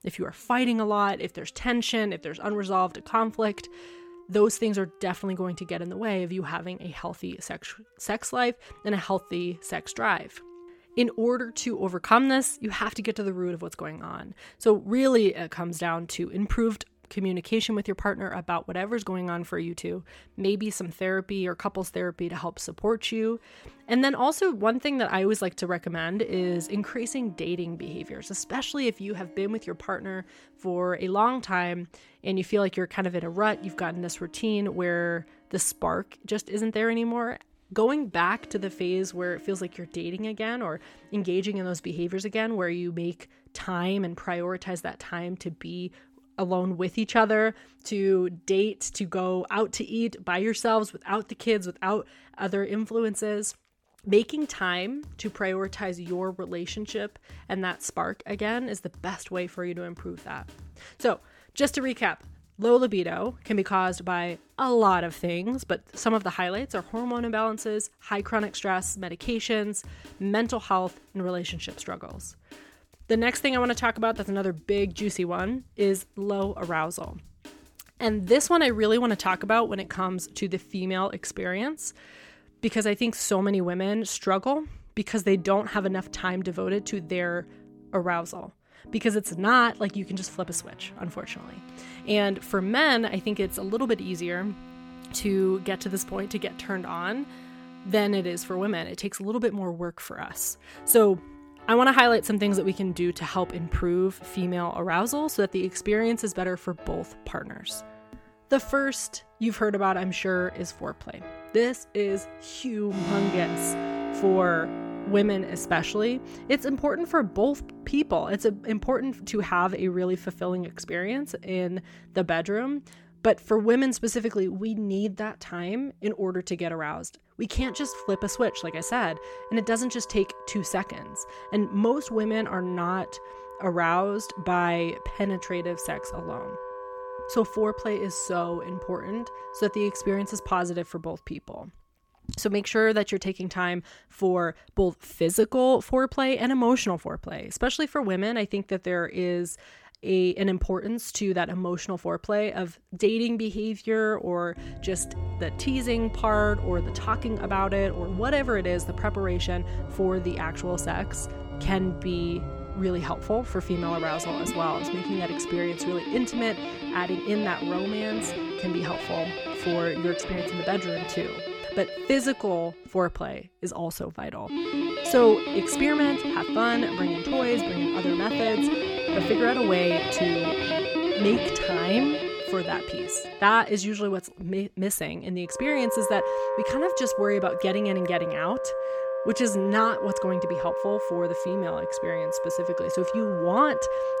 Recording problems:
background music; loud; throughout; 6 dB below the speech

